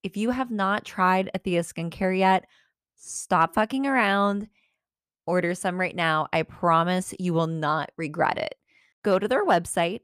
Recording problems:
none

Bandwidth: 14.5 kHz